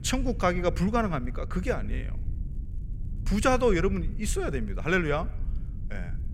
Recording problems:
low rumble; faint; throughout; 25 dB below the speech

